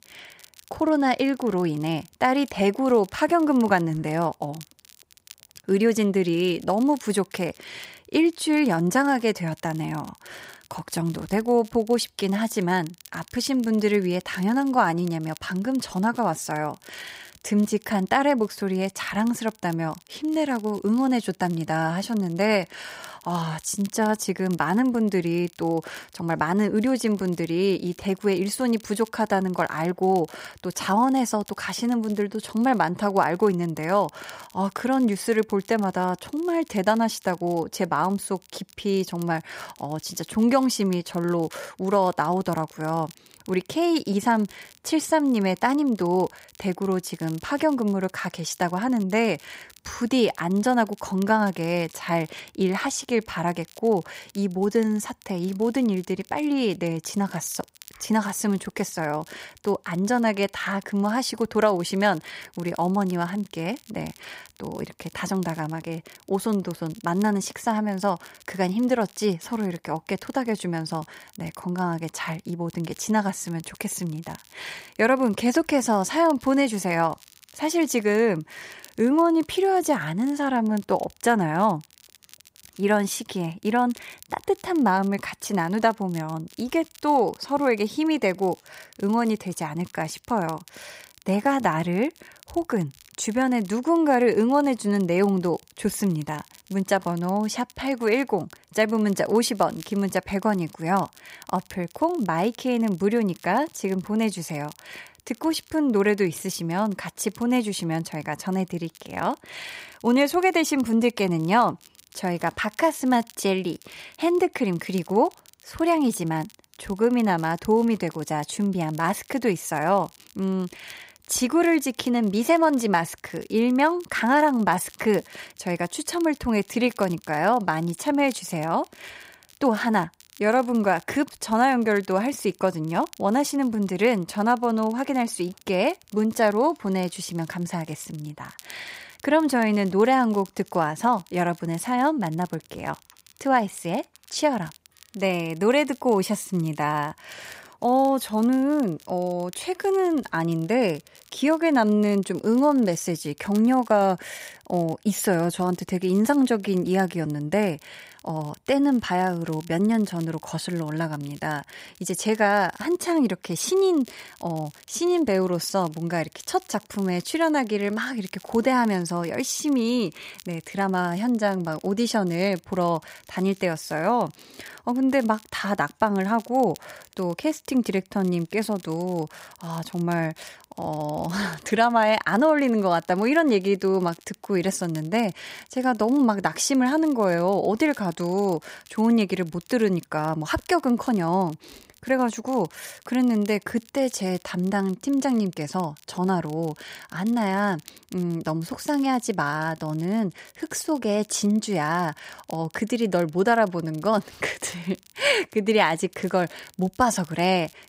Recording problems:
crackle, like an old record; faint; 25 dB below the speech

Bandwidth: 15.5 kHz